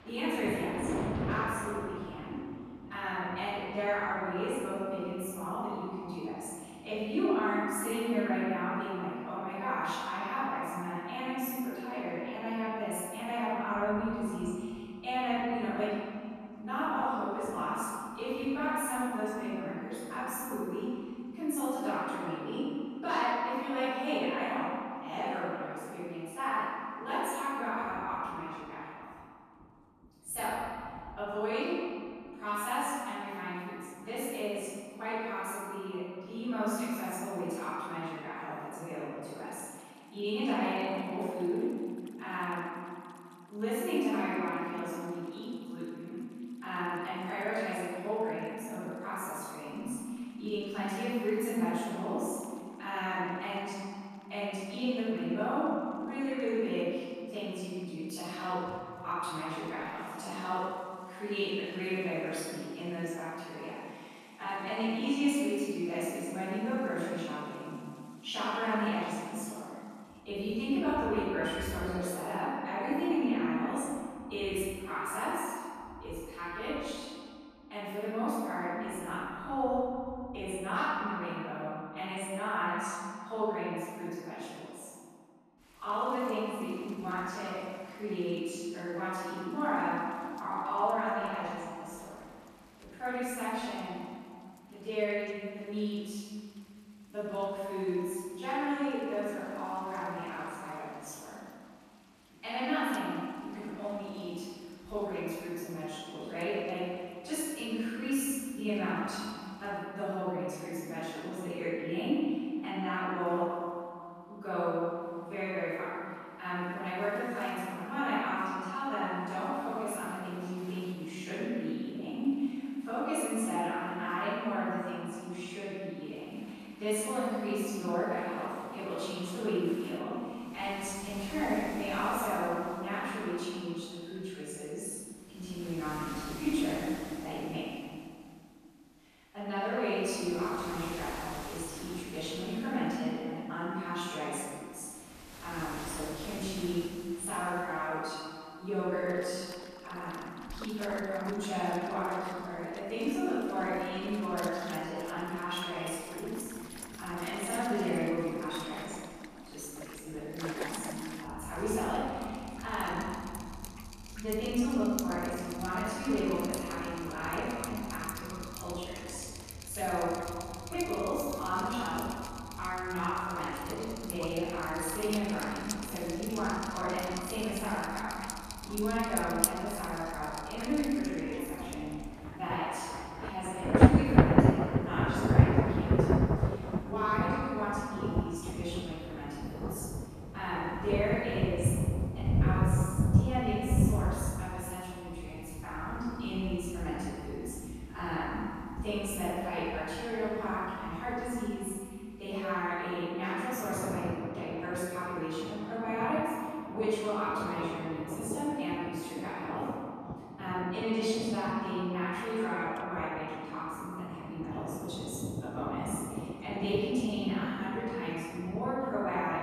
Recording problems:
room echo; strong; dies away in 2.1 s
off-mic speech; far
rain or running water; loud; throughout; 1 dB below the speech

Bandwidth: 14.5 kHz